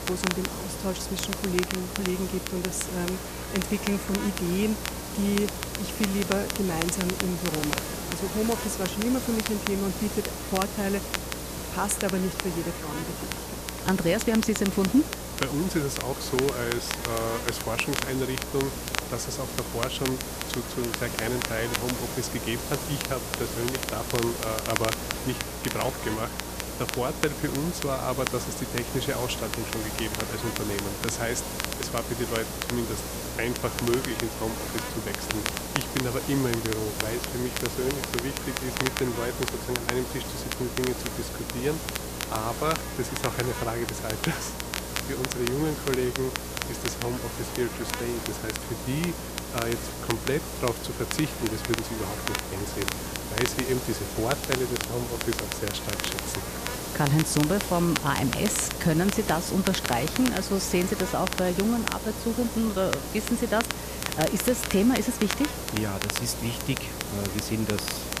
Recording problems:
electrical hum; loud; throughout; 60 Hz, 9 dB below the speech
hiss; loud; throughout; 6 dB below the speech
crackle, like an old record; loud; 5 dB below the speech

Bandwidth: 14.5 kHz